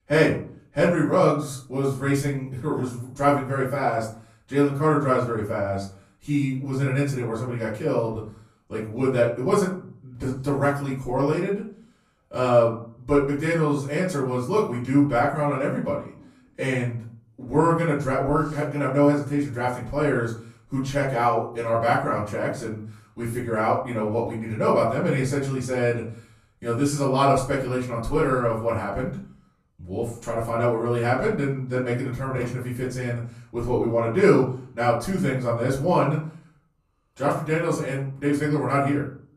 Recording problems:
off-mic speech; far
room echo; slight; dies away in 0.4 s

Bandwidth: 14.5 kHz